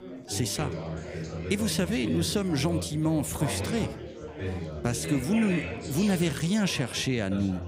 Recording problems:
chatter from many people; loud; throughout; 7 dB below the speech

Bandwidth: 15.5 kHz